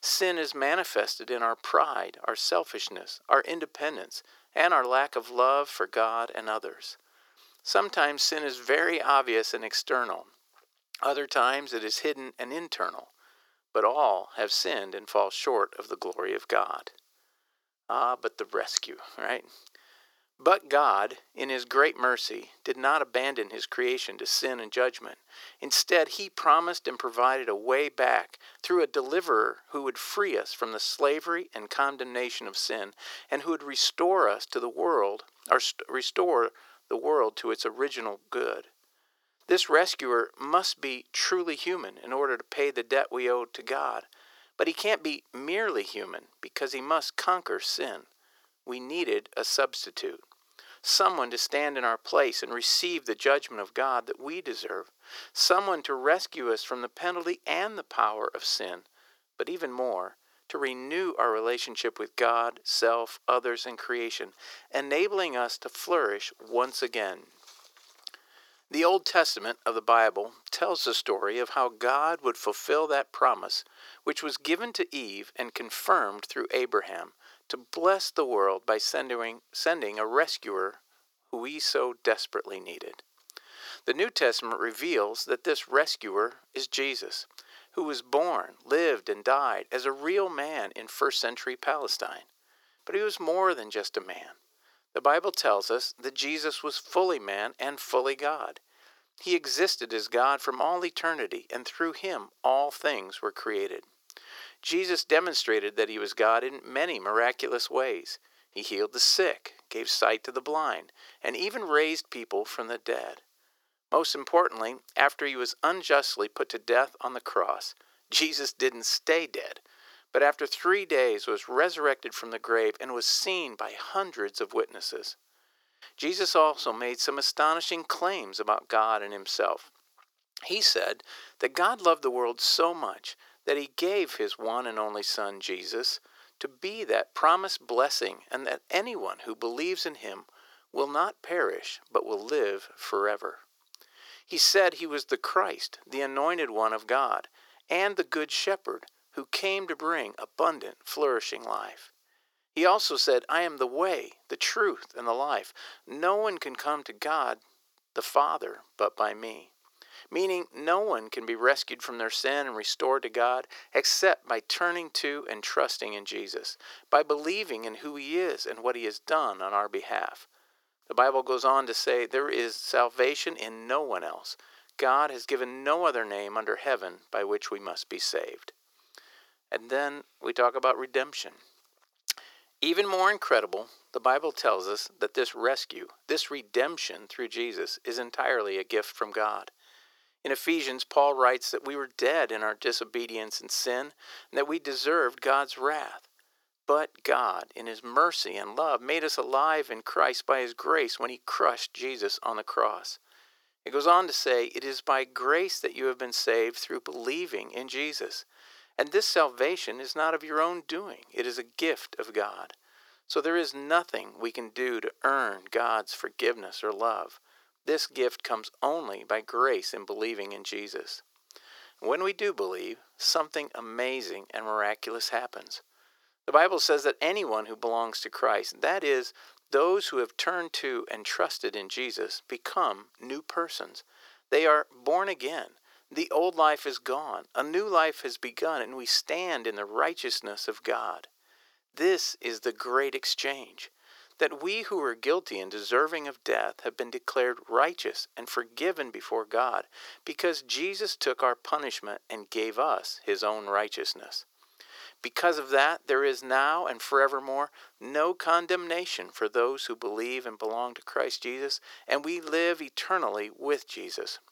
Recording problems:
thin; very; fading below 350 Hz

